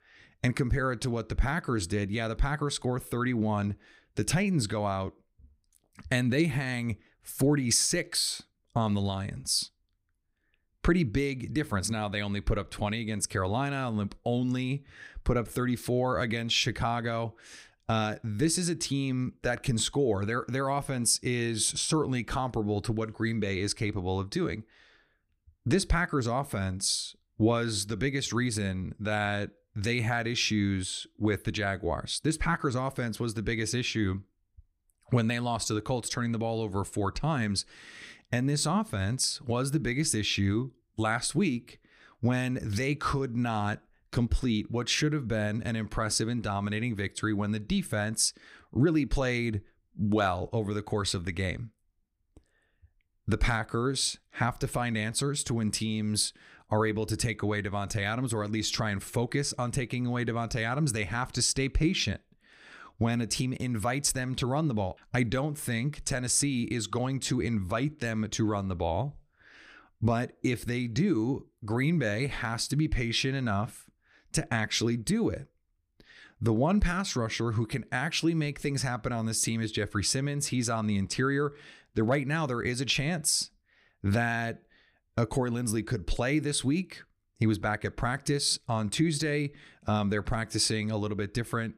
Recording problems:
none

